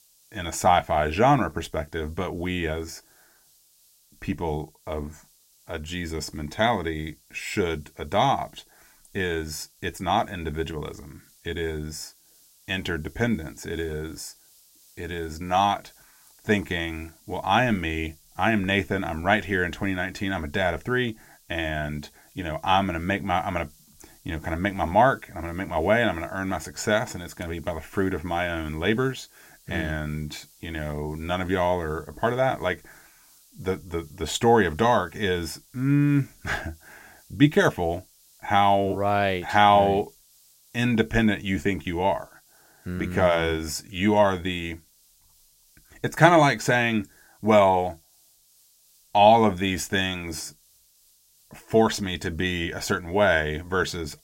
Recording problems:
hiss; faint; throughout; 30 dB below the speech

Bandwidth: 16 kHz